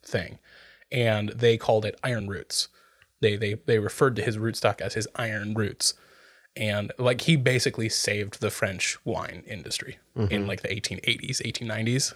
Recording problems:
uneven, jittery; slightly; from 1 to 9.5 s

